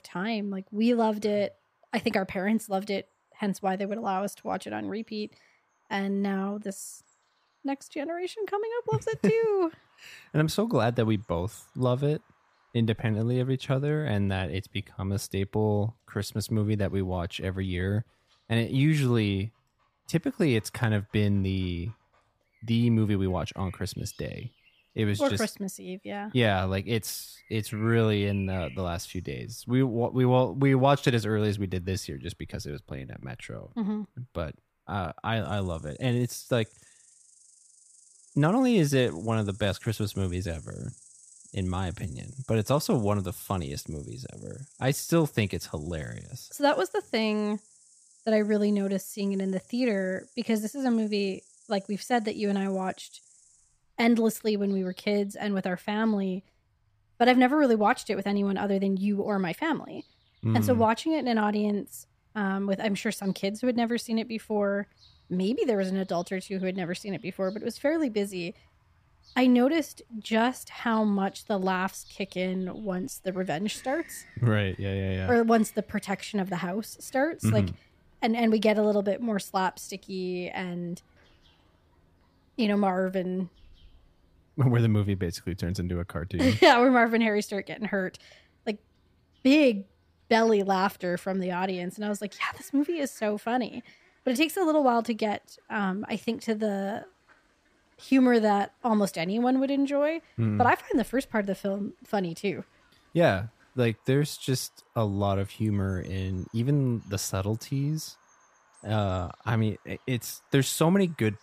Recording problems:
animal sounds; faint; throughout; 30 dB below the speech

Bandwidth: 15 kHz